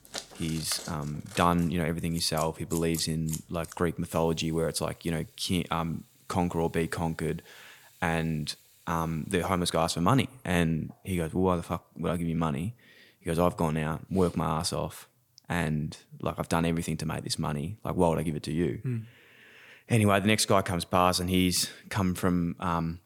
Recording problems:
household noises; noticeable; until 9.5 s; 15 dB below the speech

